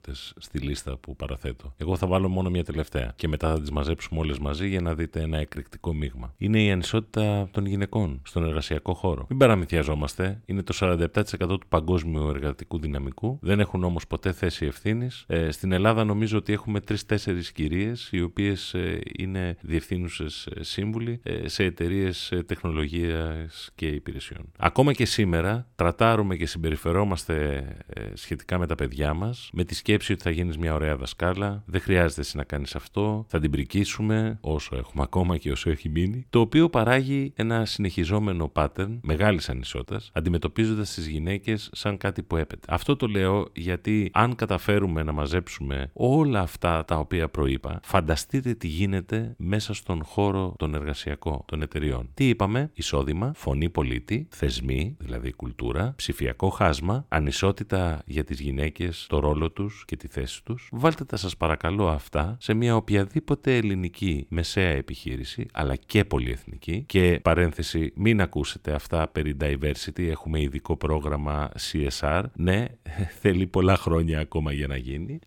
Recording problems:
none

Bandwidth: 17.5 kHz